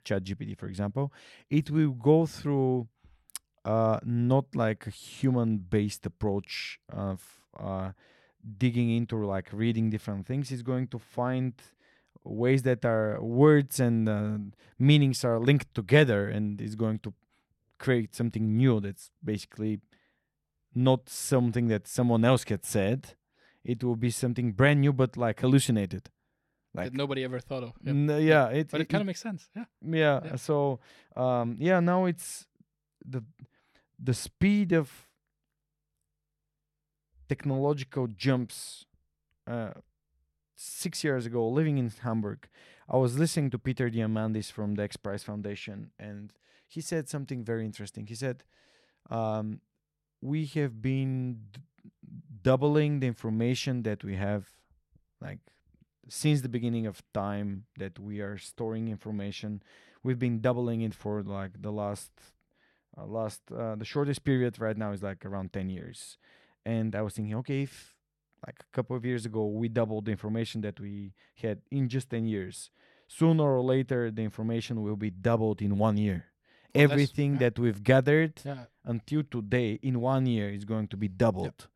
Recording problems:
none

